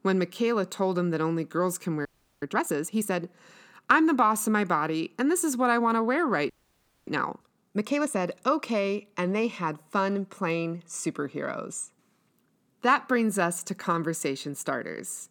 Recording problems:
audio freezing; at 2 s and at 6.5 s for 0.5 s

